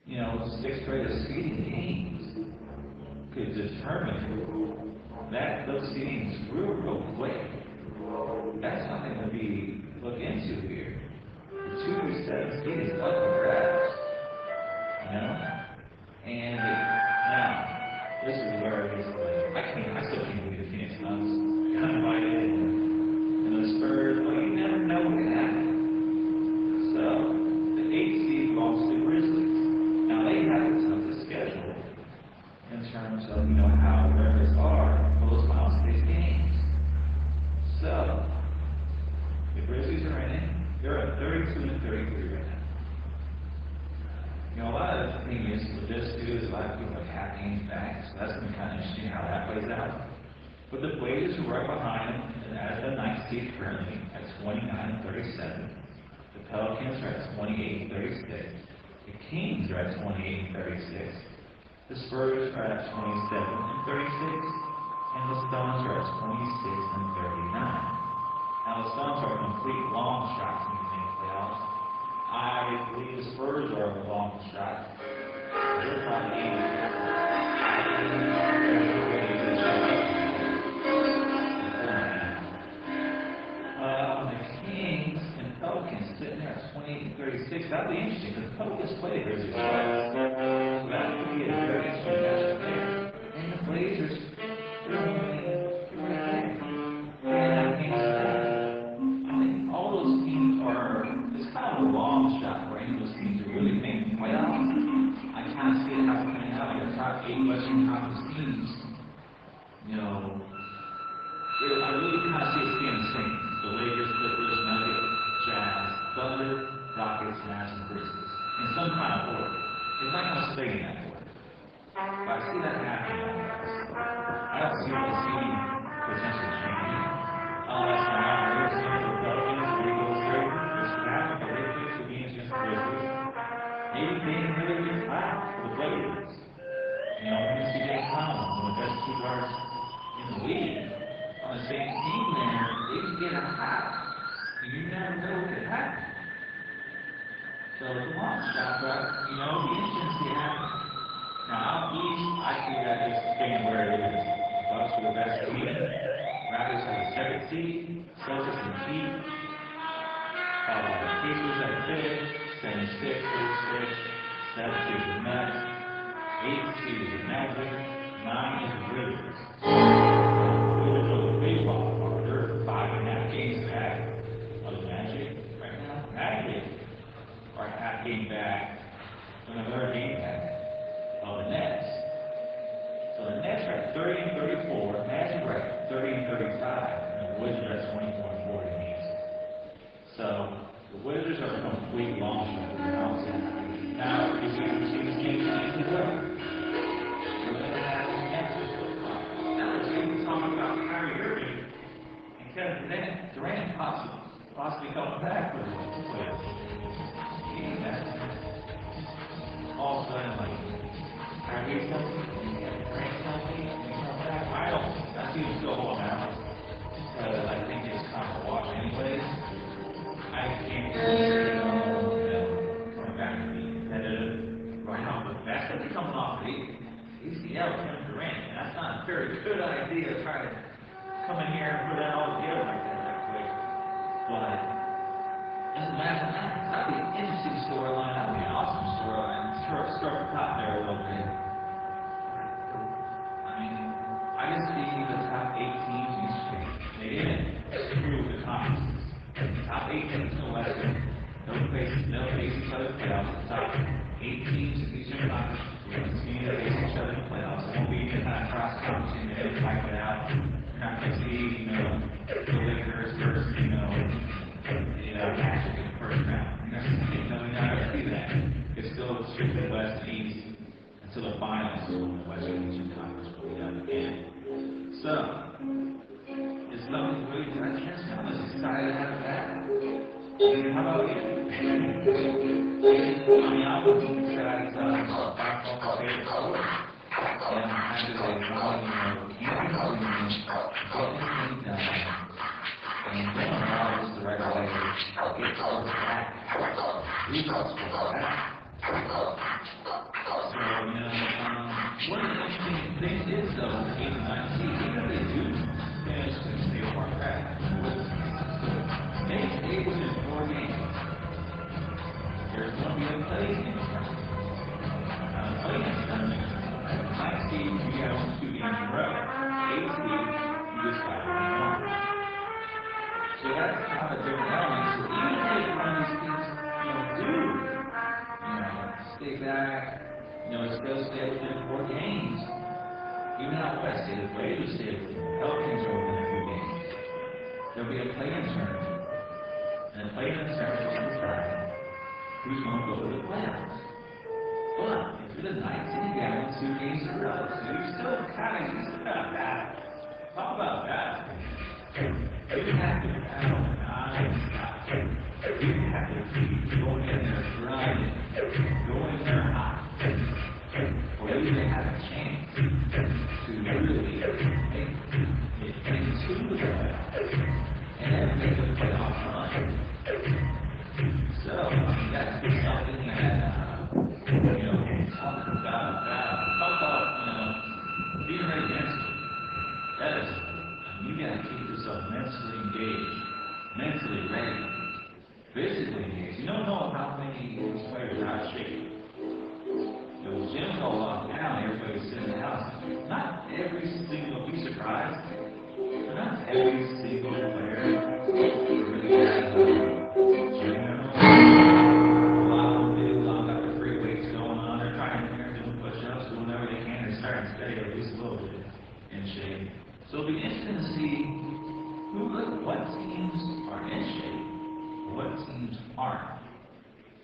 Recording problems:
off-mic speech; far
garbled, watery; badly
room echo; noticeable; dies away in 1 s
background music; very loud; throughout; 4 dB above the speech
rain or running water; noticeable; throughout; 15 dB below the speech
murmuring crowd; noticeable; throughout; 20 dB below the speech

